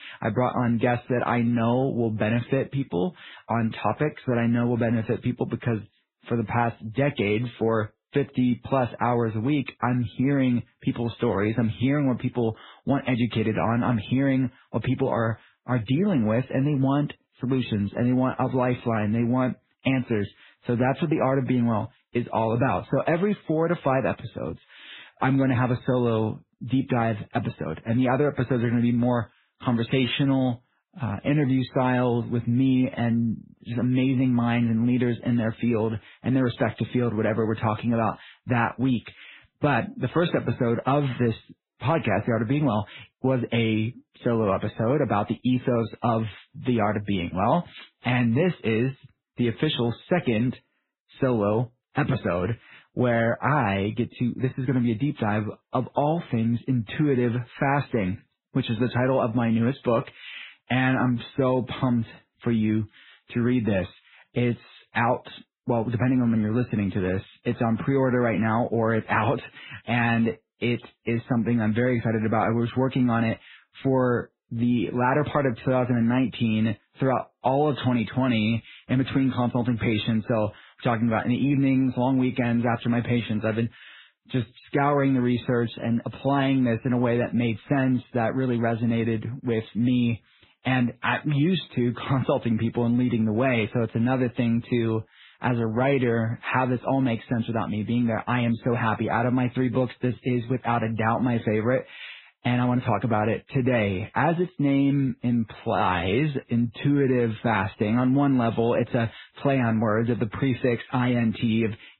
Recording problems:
garbled, watery; badly
high frequencies cut off; severe; nothing above 4 kHz

